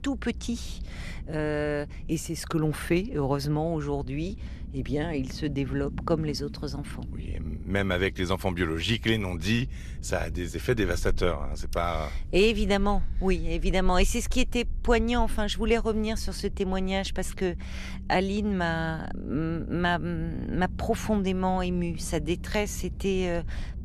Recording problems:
low rumble; faint; throughout; 20 dB below the speech

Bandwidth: 13.5 kHz